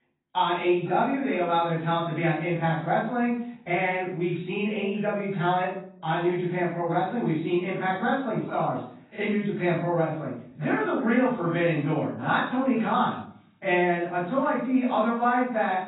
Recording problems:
off-mic speech; far
garbled, watery; badly; nothing above 4 kHz
room echo; noticeable; dies away in 0.5 s

